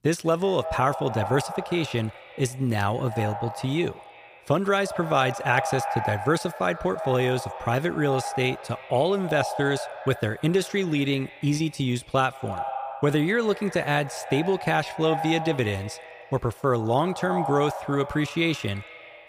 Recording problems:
echo of what is said; strong; throughout; 150 ms later, 9 dB below the speech

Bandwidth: 15 kHz